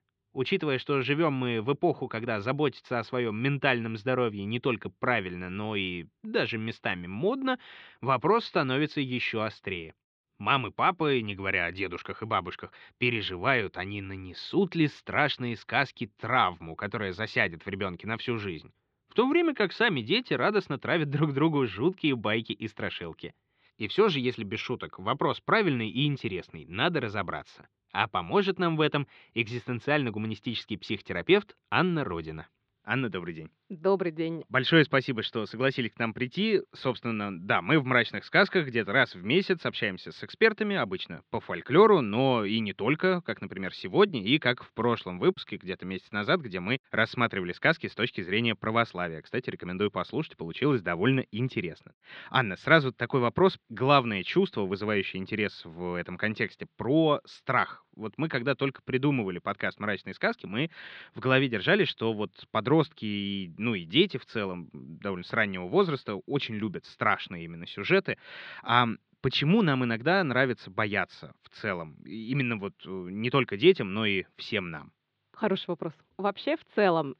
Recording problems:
muffled; slightly; fading above 3.5 kHz

